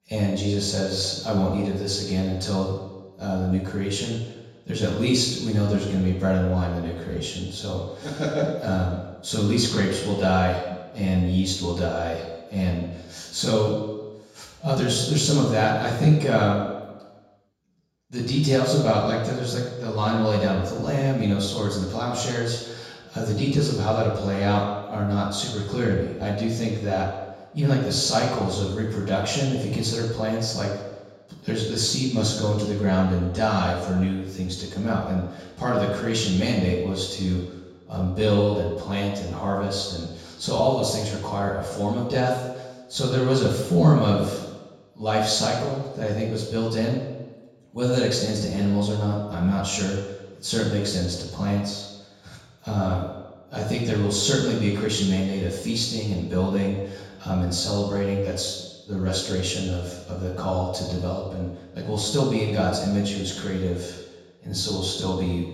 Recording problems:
off-mic speech; far
room echo; noticeable; dies away in 1.1 s

